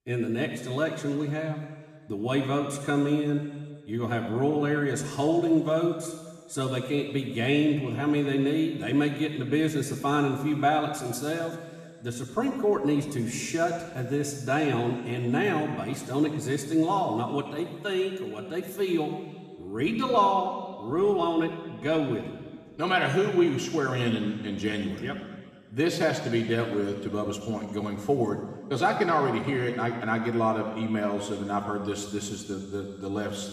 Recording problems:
room echo; noticeable; dies away in 1.6 s
off-mic speech; somewhat distant

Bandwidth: 14.5 kHz